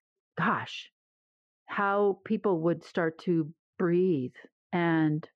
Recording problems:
muffled; very; fading above 1.5 kHz

